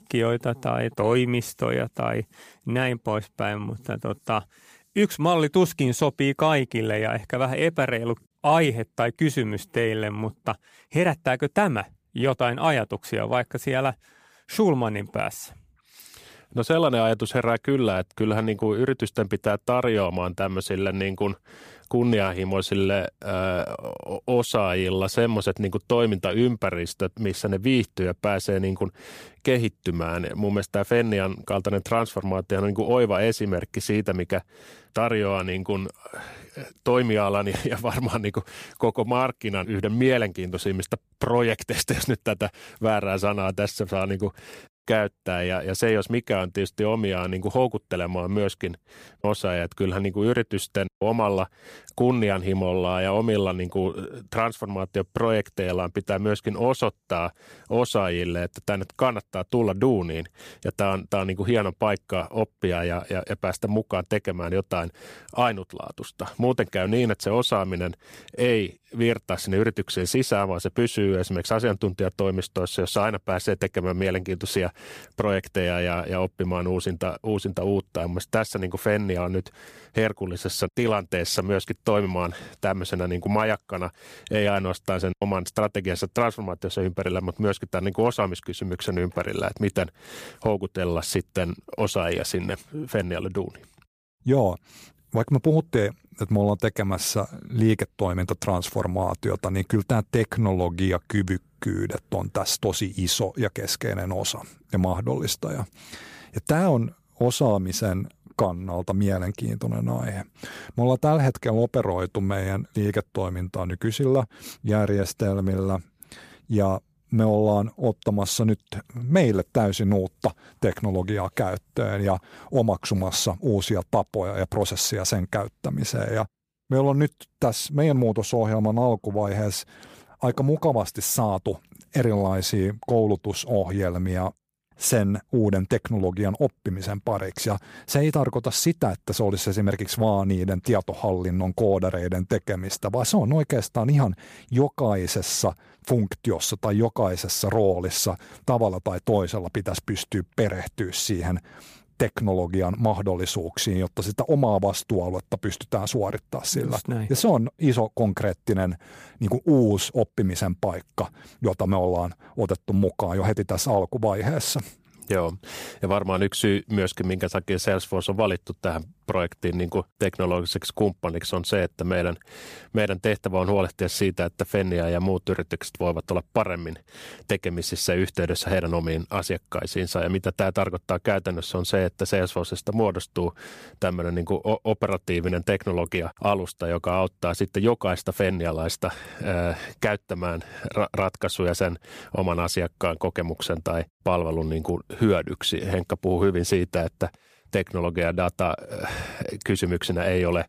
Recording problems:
none

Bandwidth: 15 kHz